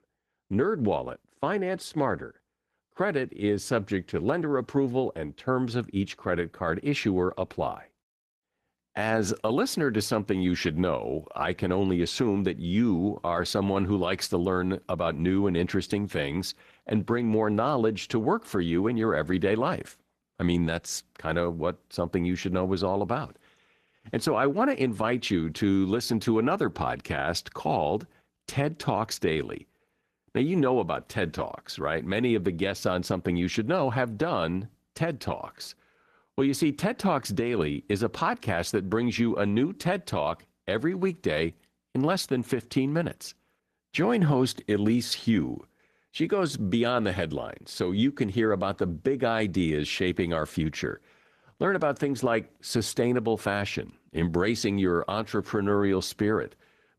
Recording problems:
garbled, watery; slightly; nothing above 14 kHz

